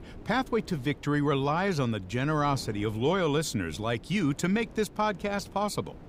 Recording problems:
wind noise on the microphone; occasional gusts; 25 dB below the speech

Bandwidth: 15.5 kHz